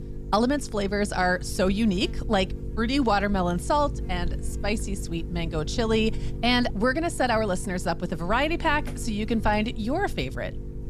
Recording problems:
electrical hum; noticeable; throughout; 50 Hz, 20 dB below the speech

